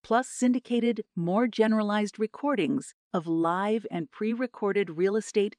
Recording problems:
none

